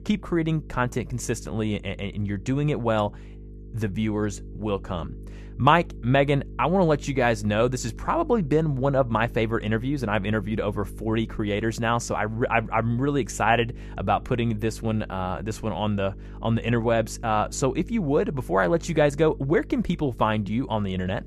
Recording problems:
electrical hum; faint; throughout; 50 Hz, 25 dB below the speech

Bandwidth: 14.5 kHz